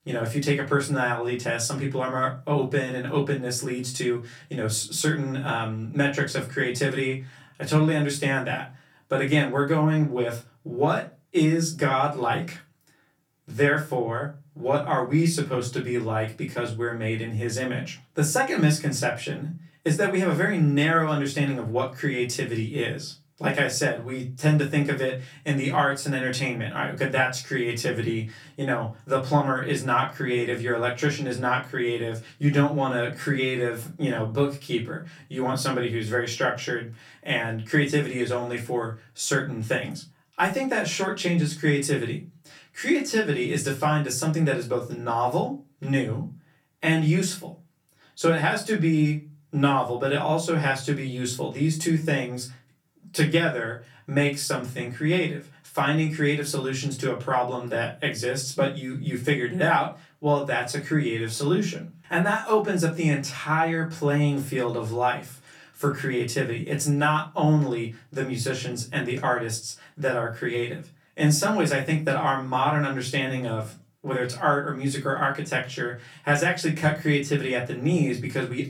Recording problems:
off-mic speech; far
room echo; very slight; dies away in 0.3 s

